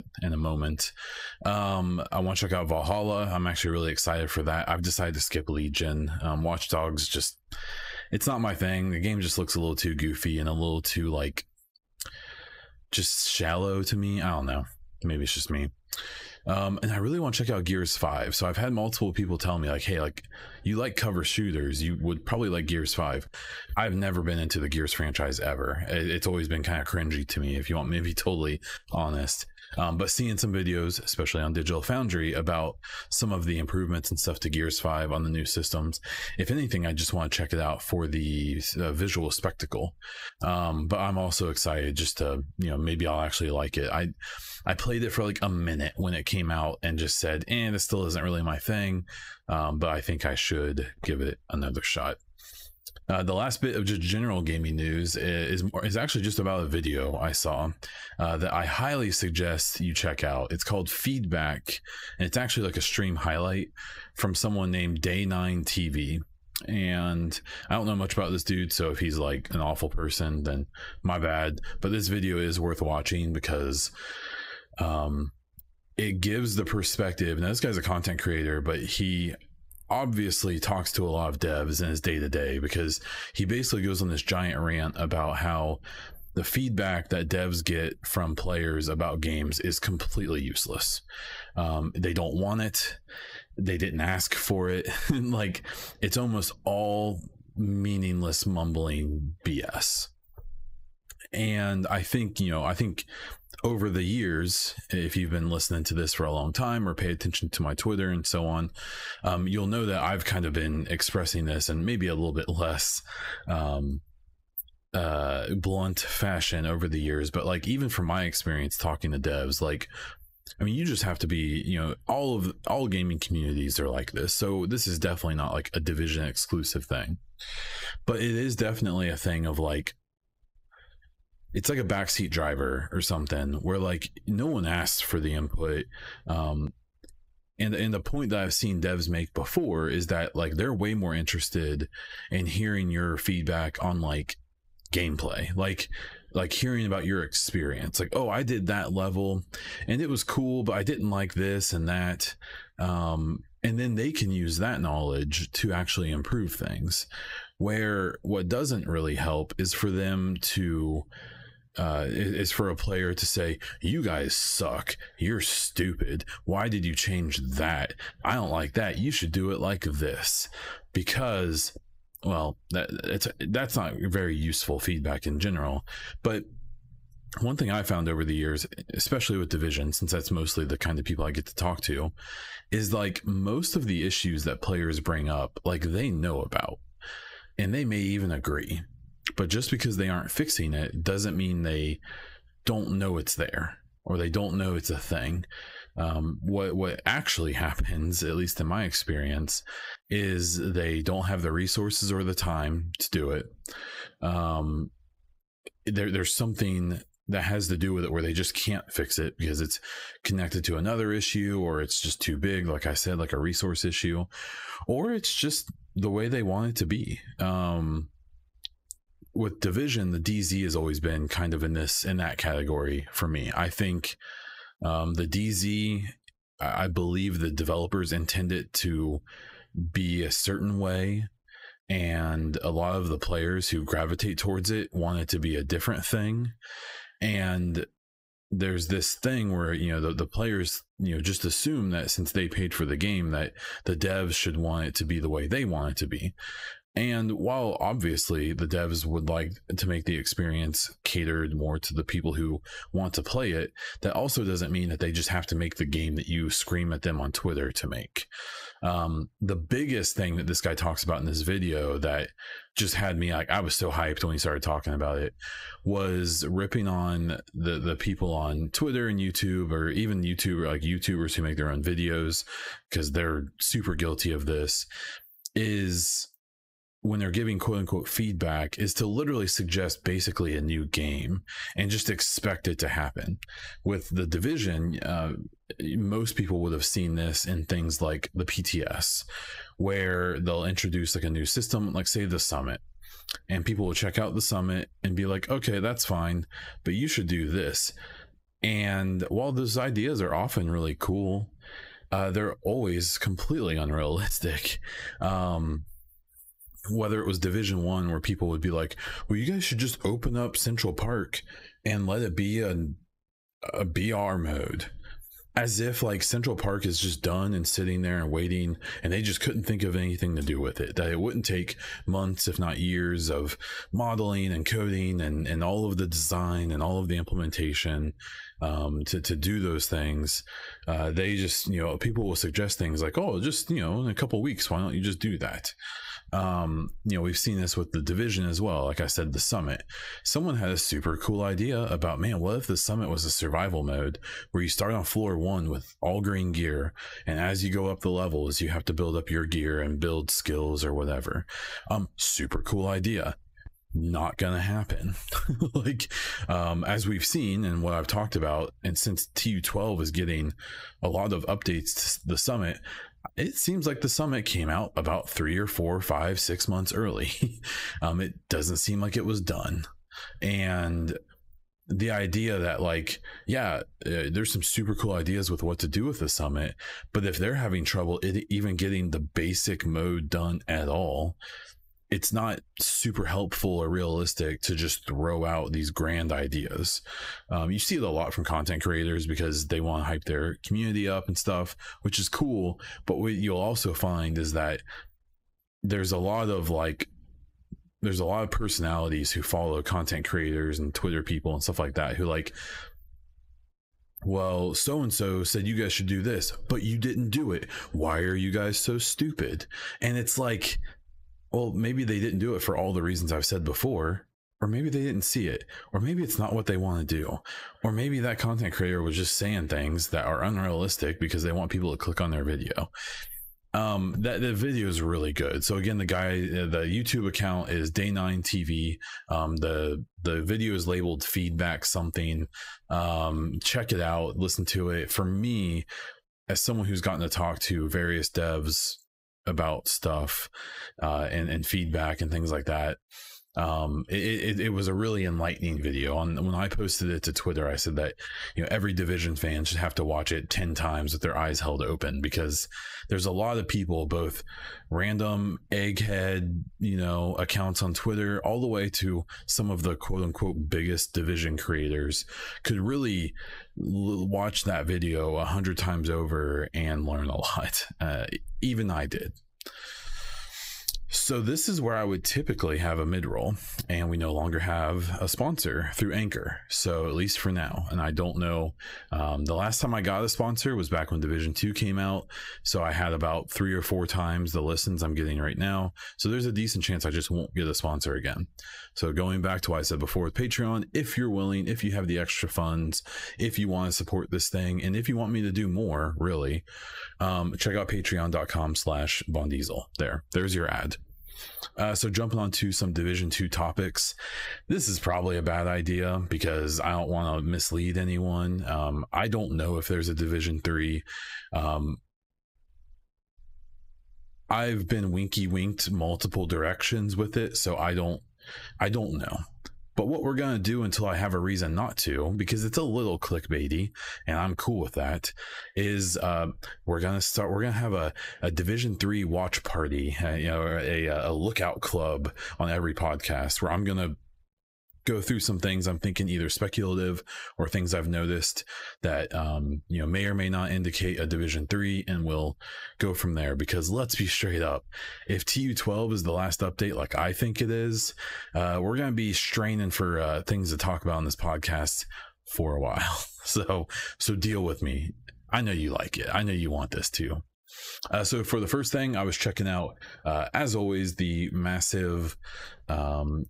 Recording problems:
squashed, flat; heavily

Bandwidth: 15.5 kHz